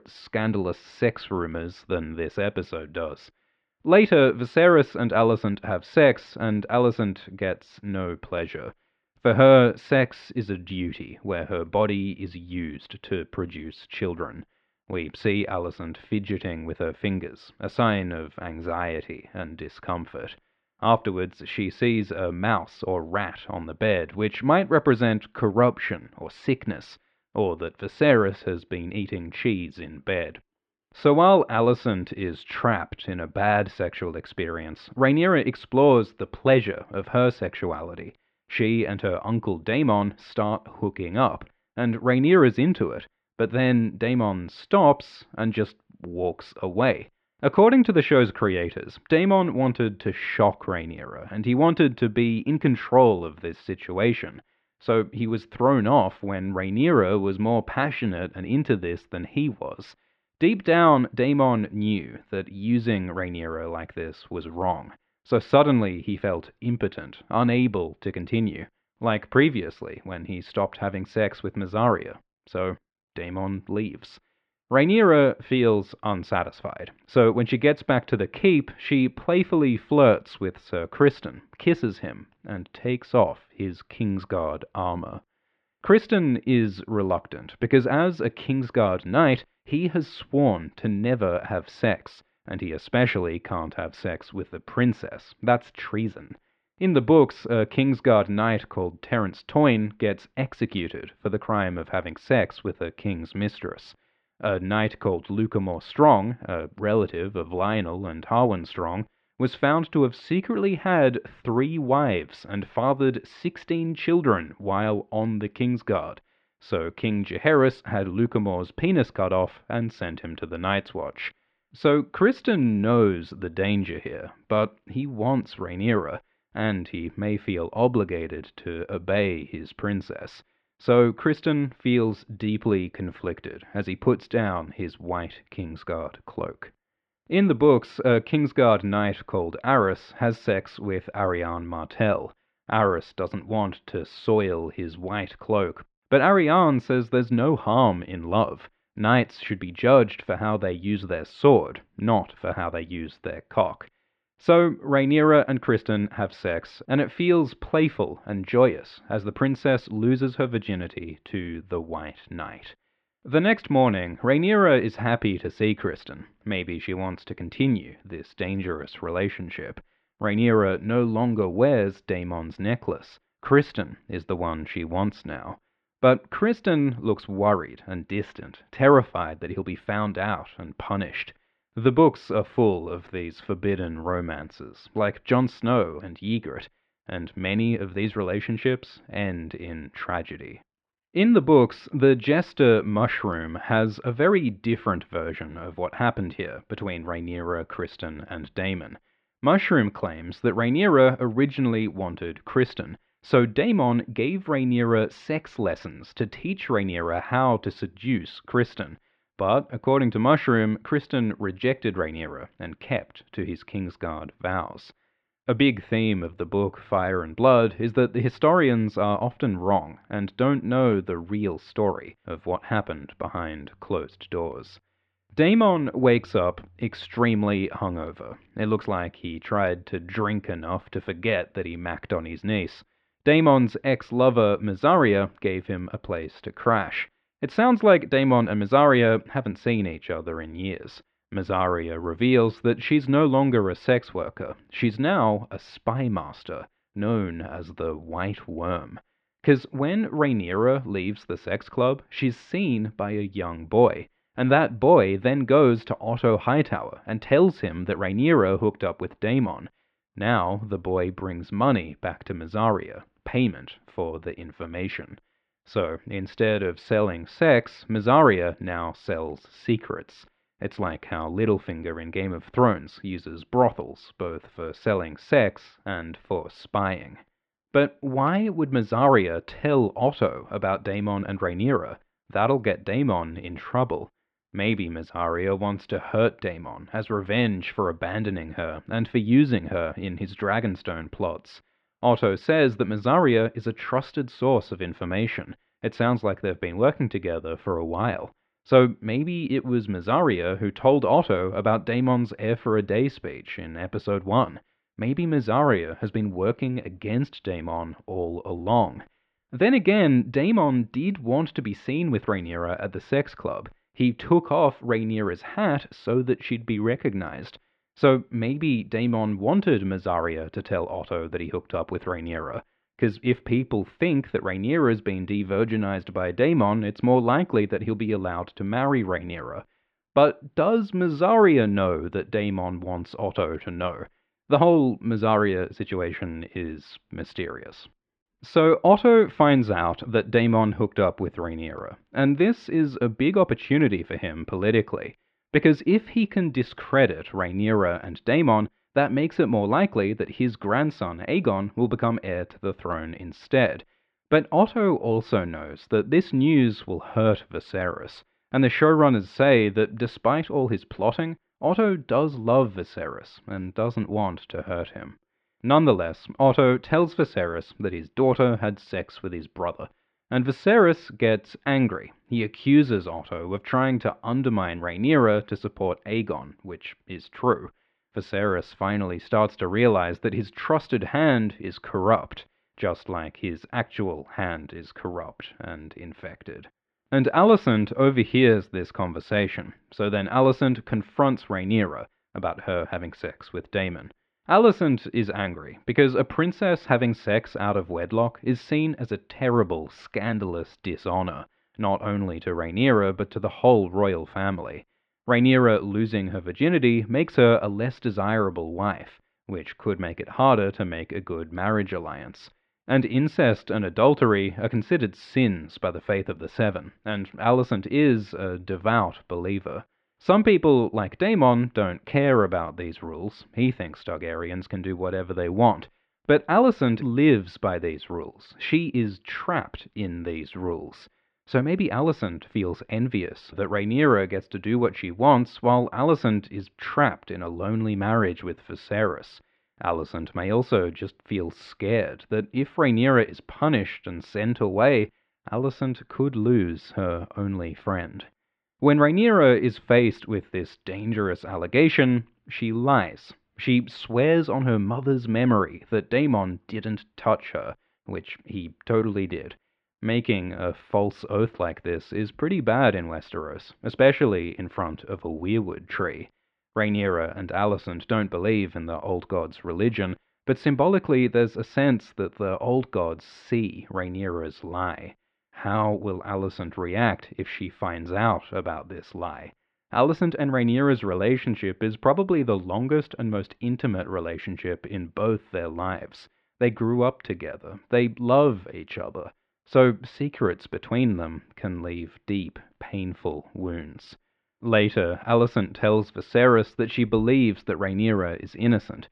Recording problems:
muffled; very; fading above 3 kHz

